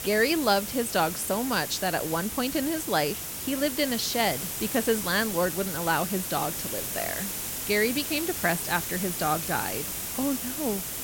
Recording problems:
hiss; loud; throughout; 3 dB below the speech

